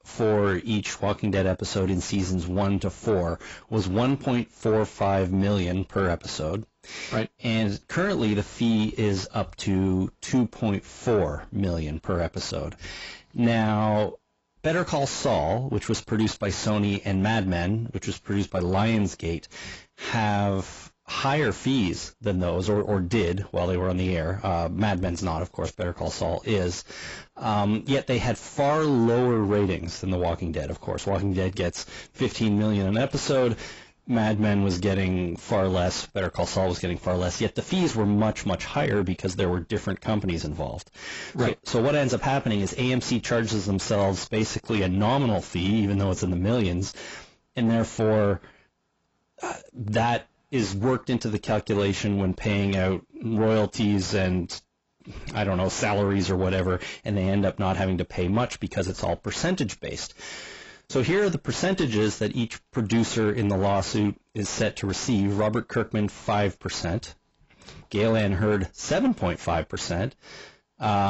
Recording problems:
garbled, watery; badly; nothing above 7.5 kHz
distortion; slight; 10 dB below the speech
abrupt cut into speech; at the end

